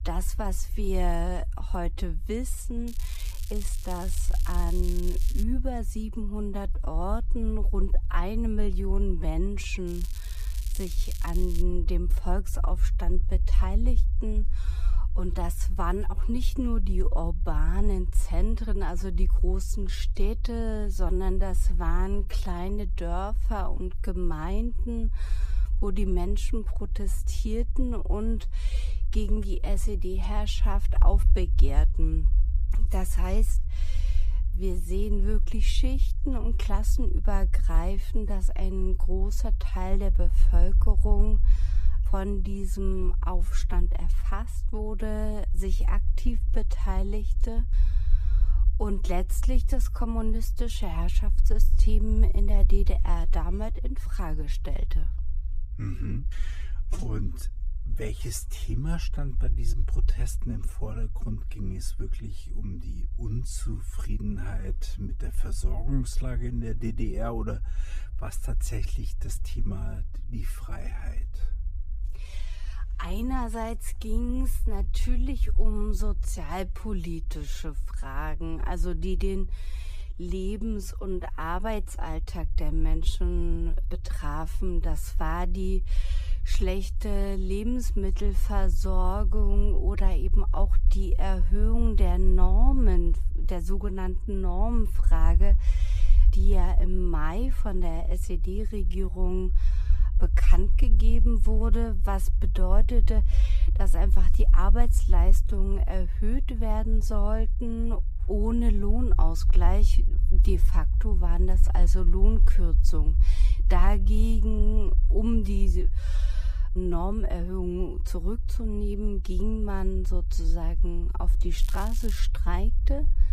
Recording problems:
wrong speed, natural pitch; too slow; 0.6 times normal speed
low rumble; noticeable; throughout; 15 dB below the speech
crackling; noticeable; from 3 to 5.5 s, from 10 to 12 s and at 2:02; 10 dB below the speech

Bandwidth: 14.5 kHz